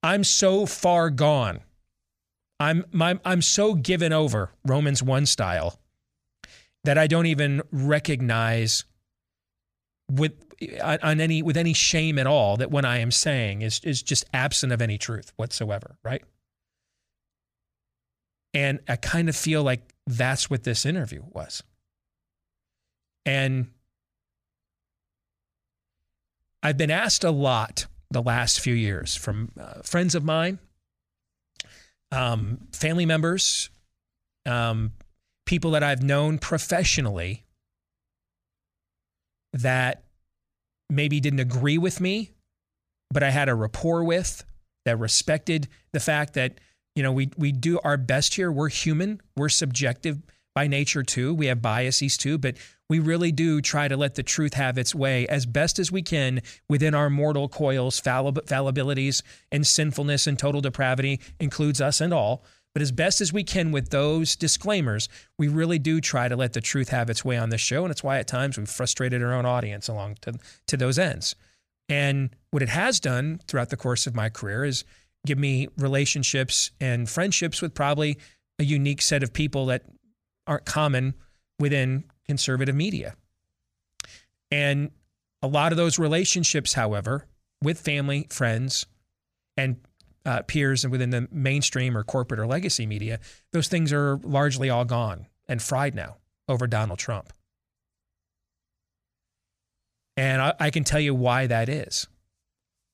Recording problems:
none

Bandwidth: 15 kHz